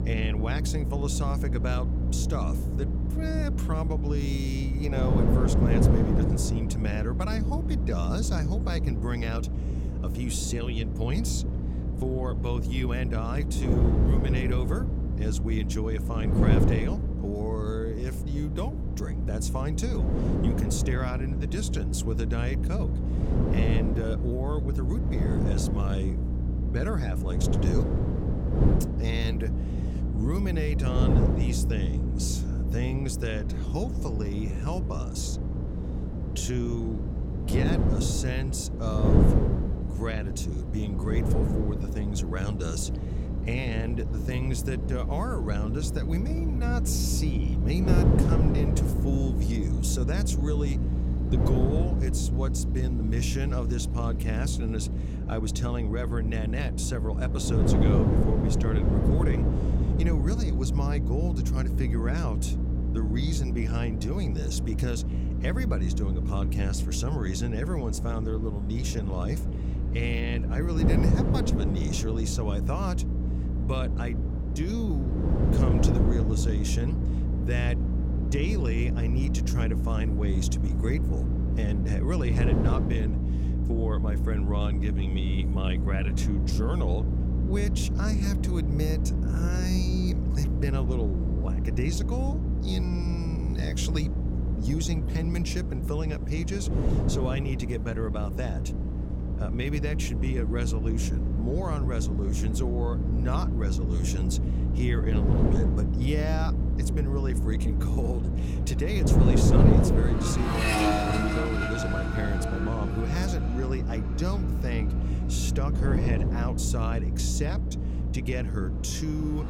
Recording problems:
wind noise on the microphone; heavy; 3 dB below the speech
electrical hum; loud; throughout; 60 Hz, 7 dB below the speech
traffic noise; loud; throughout; 5 dB below the speech

